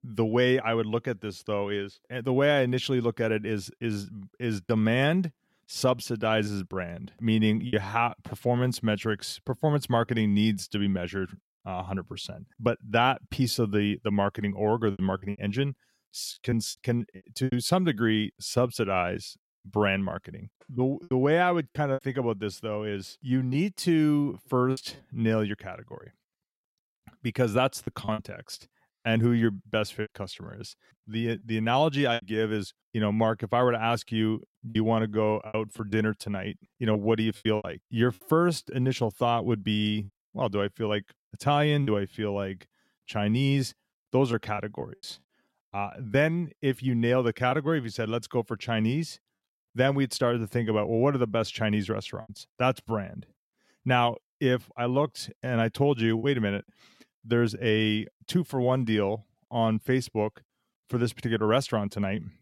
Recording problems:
choppy; occasionally; 4% of the speech affected

